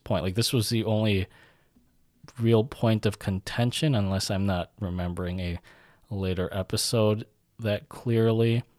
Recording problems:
none

